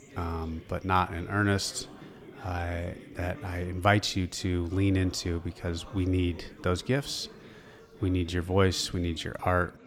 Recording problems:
chatter from many people; noticeable; throughout; 20 dB below the speech

